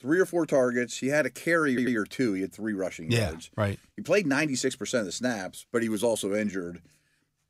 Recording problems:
audio stuttering; at 1.5 s

